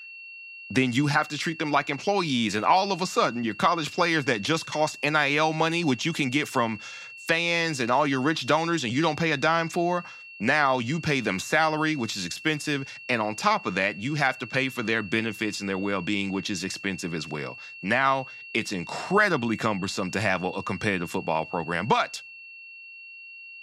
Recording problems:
high-pitched whine; noticeable; throughout; 2.5 kHz, 15 dB below the speech

